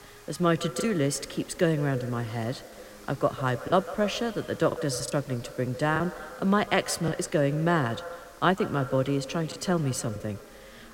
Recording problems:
echo of what is said; noticeable; throughout; 150 ms later, 15 dB below the speech
background chatter; faint; throughout; 3 voices, 25 dB below the speech
hiss; faint; throughout; 25 dB below the speech
choppy; occasionally; 4% of the speech affected

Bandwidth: 16 kHz